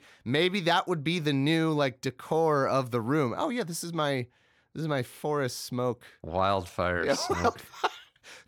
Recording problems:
none

